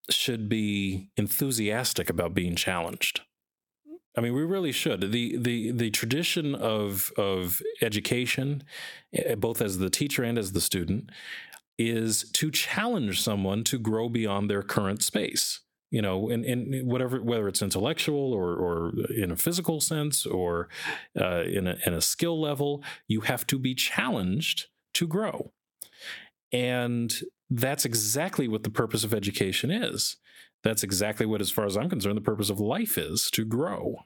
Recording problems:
squashed, flat; somewhat

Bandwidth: 18 kHz